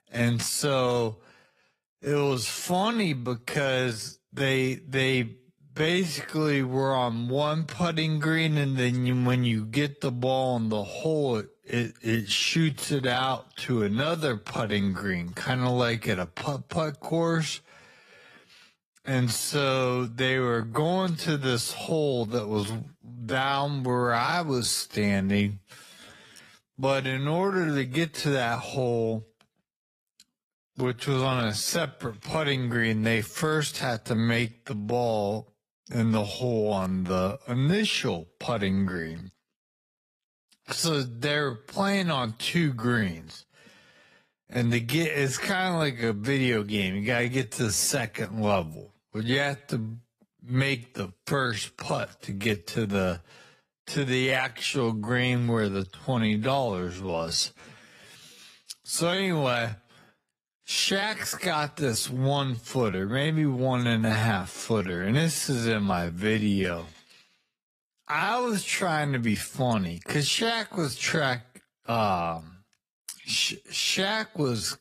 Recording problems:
wrong speed, natural pitch; too slow; 0.5 times normal speed
garbled, watery; slightly; nothing above 14.5 kHz

